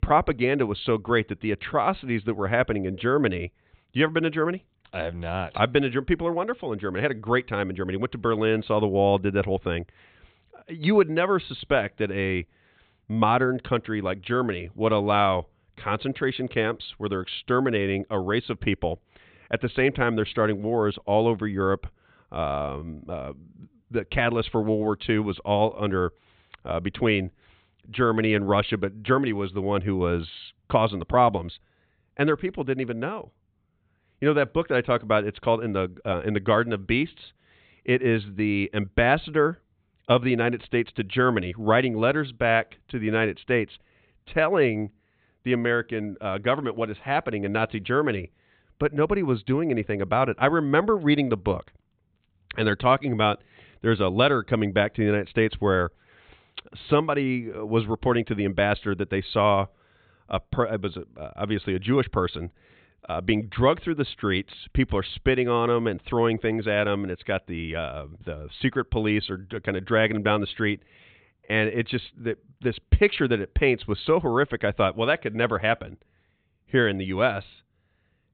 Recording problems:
high frequencies cut off; severe; nothing above 4 kHz

